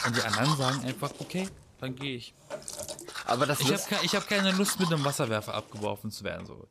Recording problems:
household noises; loud; throughout; 5 dB below the speech

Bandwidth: 14.5 kHz